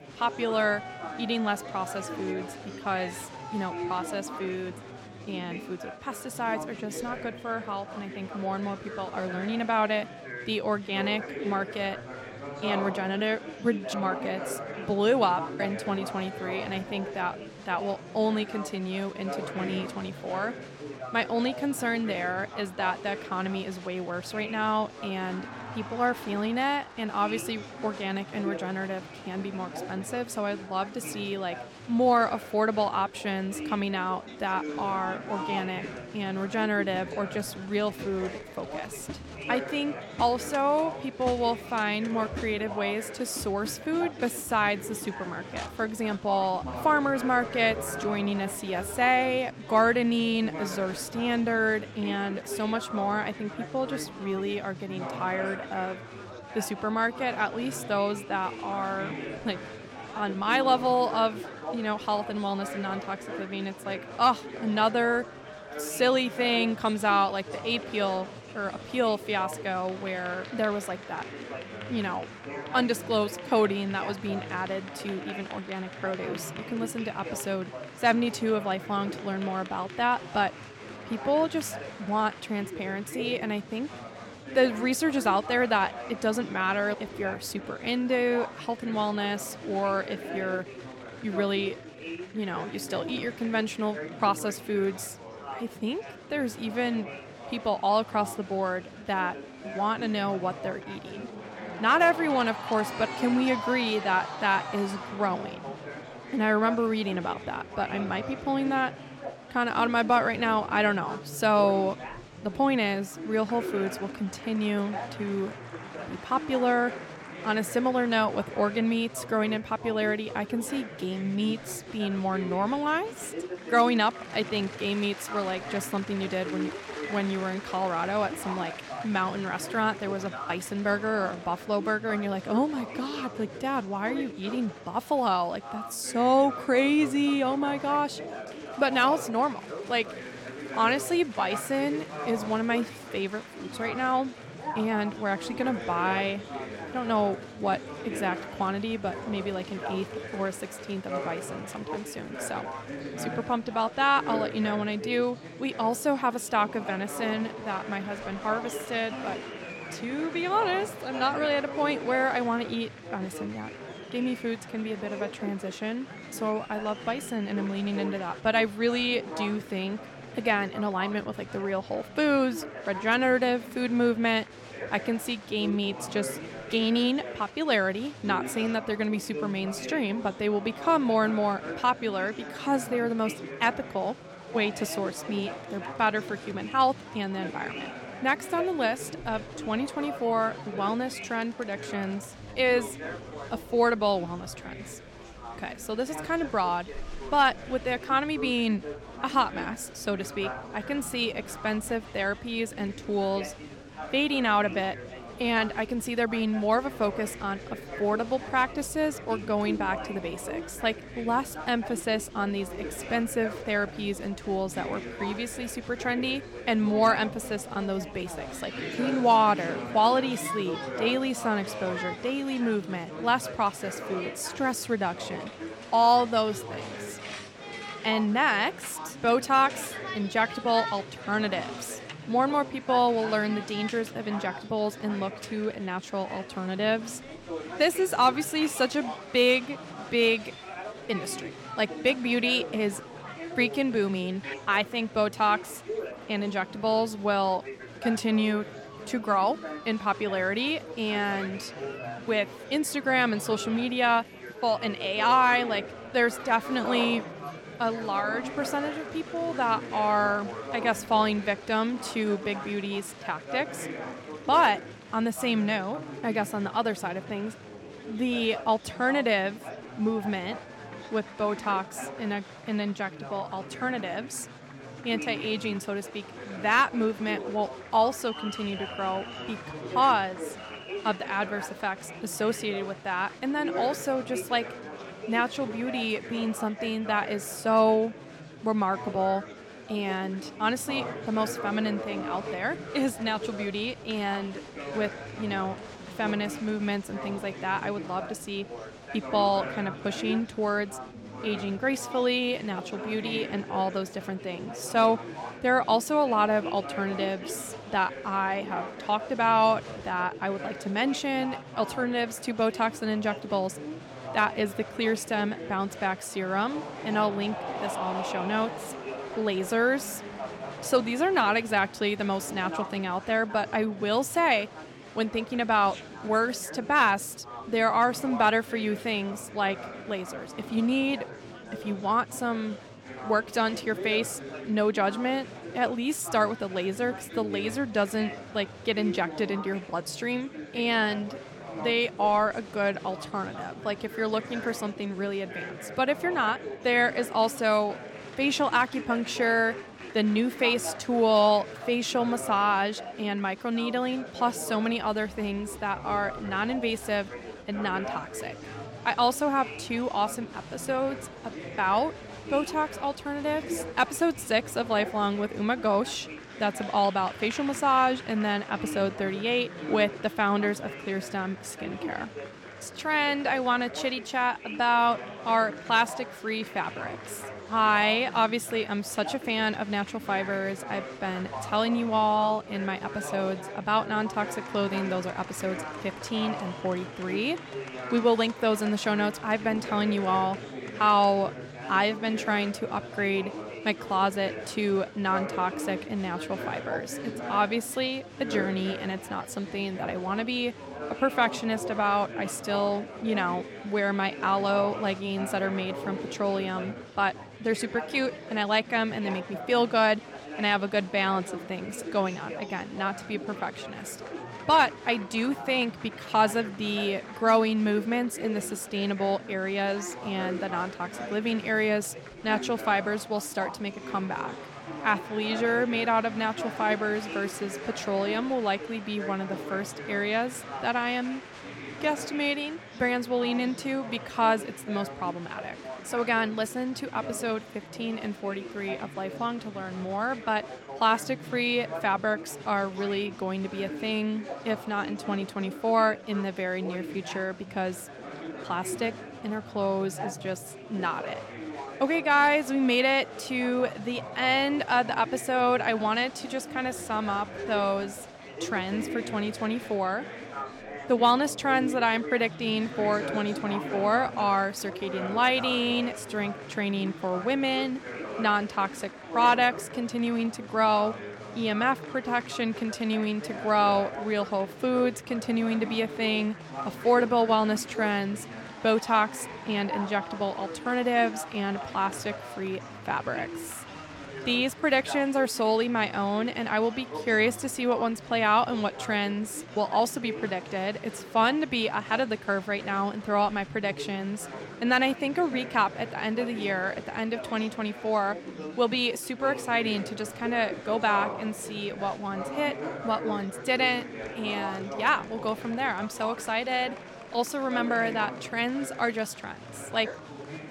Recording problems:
chatter from many people; noticeable; throughout; 10 dB below the speech

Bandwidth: 17 kHz